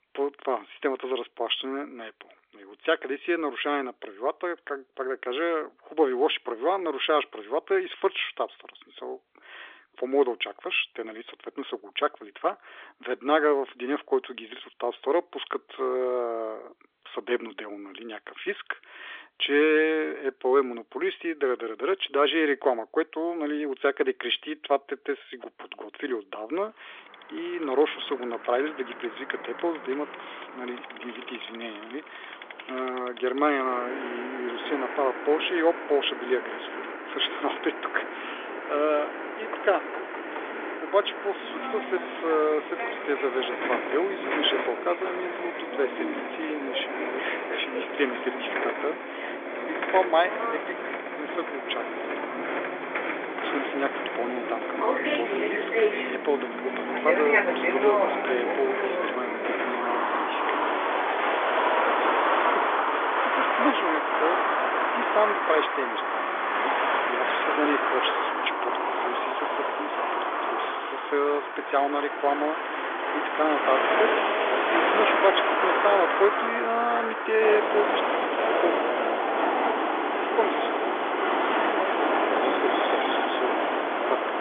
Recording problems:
phone-call audio; nothing above 3.5 kHz
traffic noise; very loud; from 27 s on; 2 dB above the speech
door banging; noticeable; at 40 s; peak 9 dB below the speech

